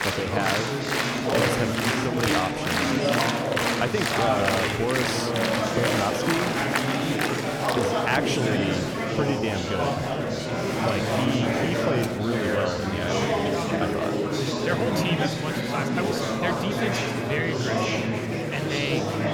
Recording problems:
murmuring crowd; very loud; throughout; 5 dB above the speech

